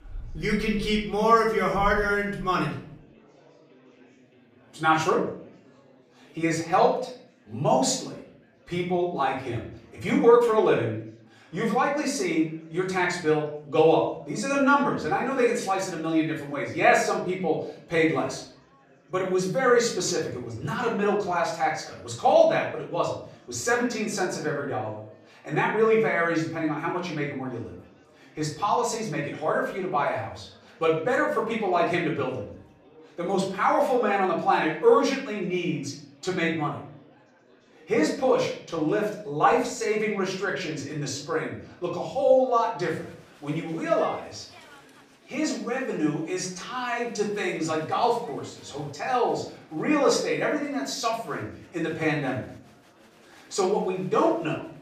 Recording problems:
off-mic speech; far
room echo; noticeable; dies away in 0.5 s
chatter from many people; faint; throughout; 30 dB below the speech

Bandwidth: 15 kHz